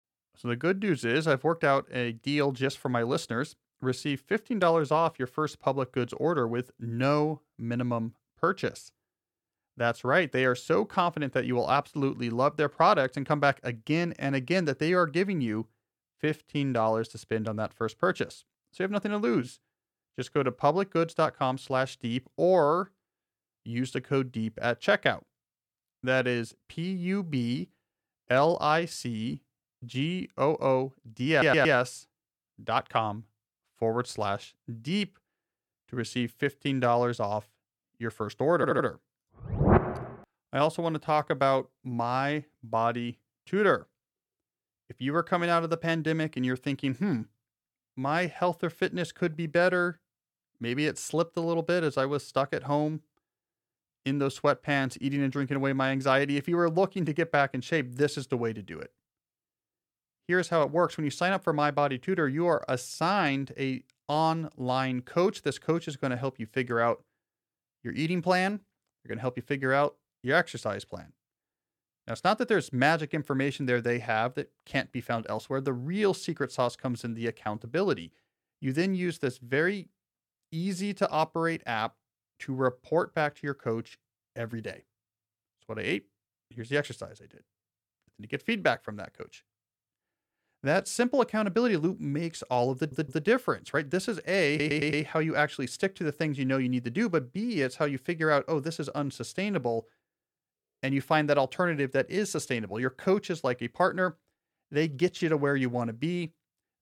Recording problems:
audio stuttering; 4 times, first at 31 s

